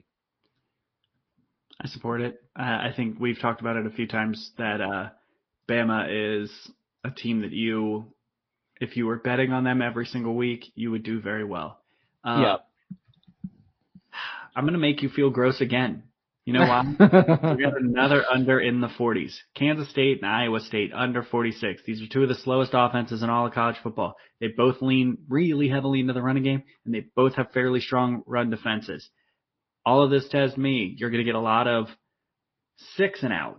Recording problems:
garbled, watery; slightly; nothing above 5.5 kHz
high frequencies cut off; slight

